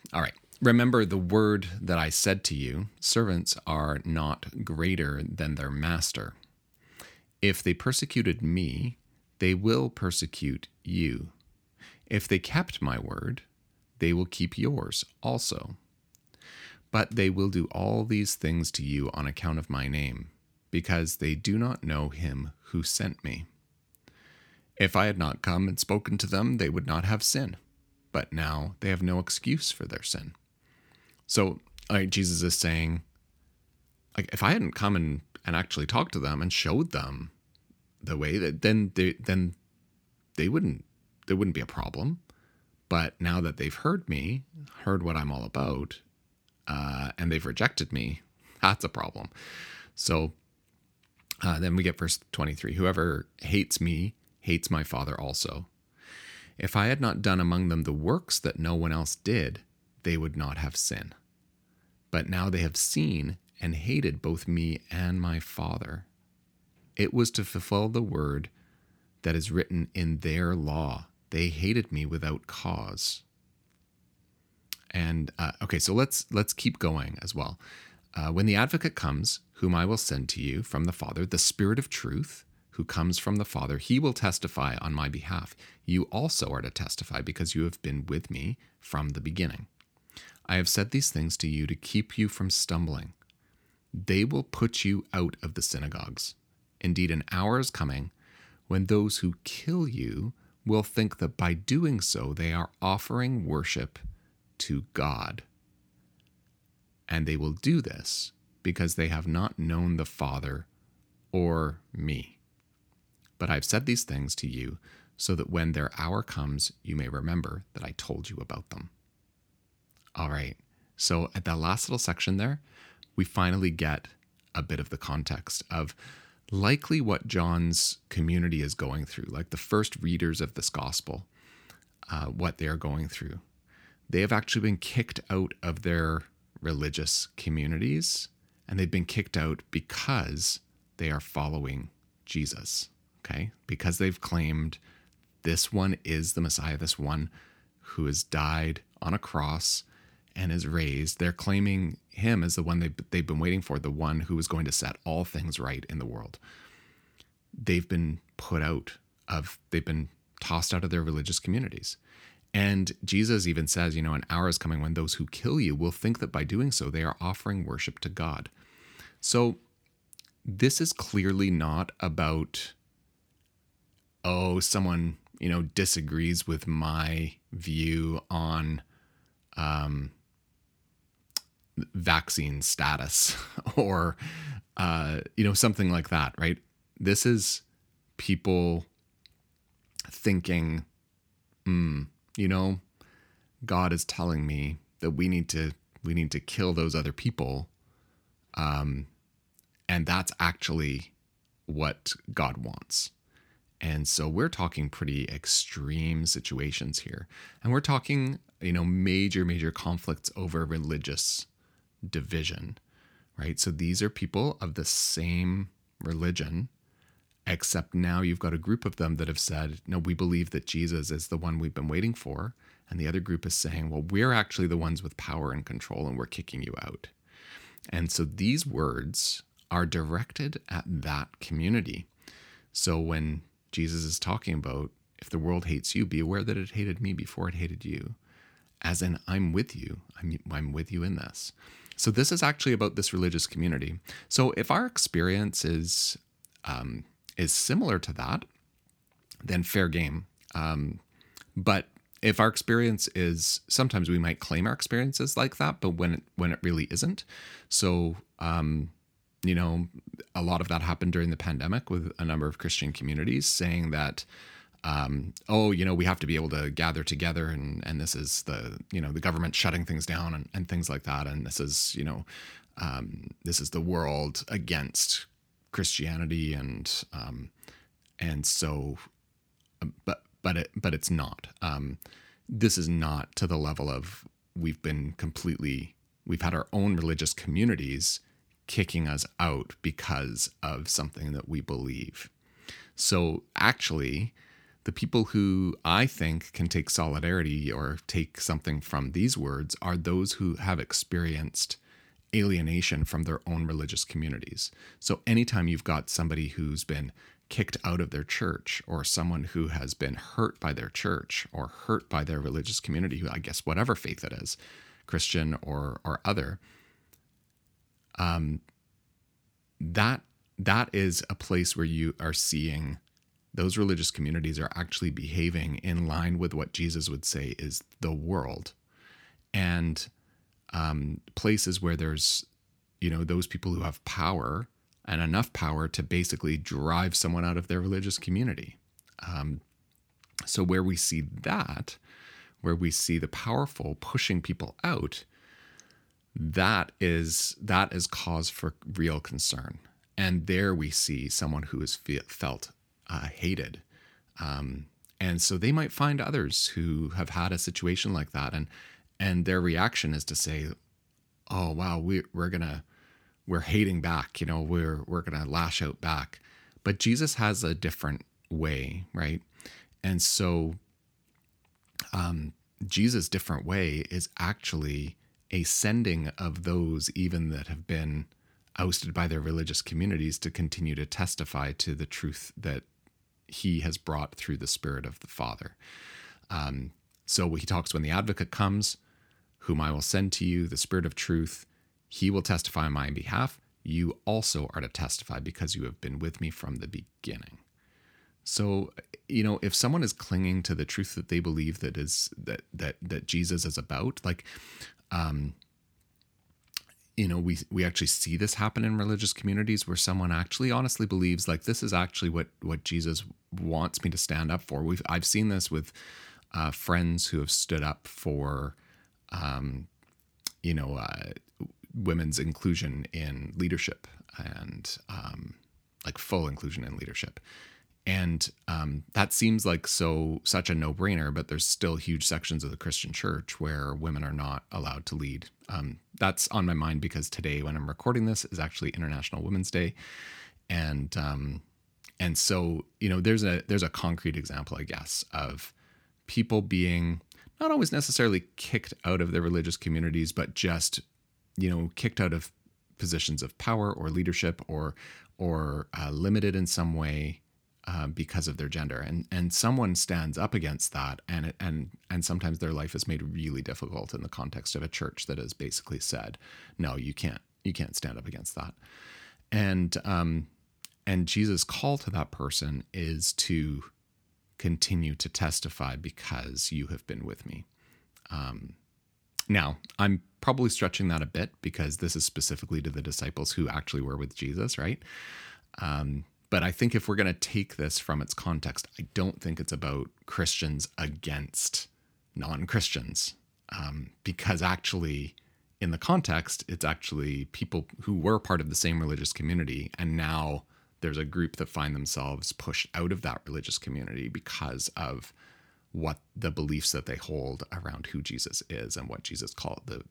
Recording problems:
none

